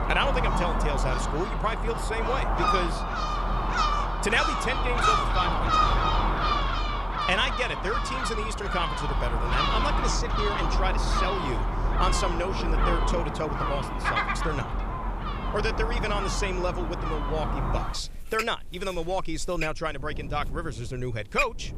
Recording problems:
animal sounds; very loud; throughout; 3 dB above the speech
wind noise on the microphone; occasional gusts; 25 dB below the speech

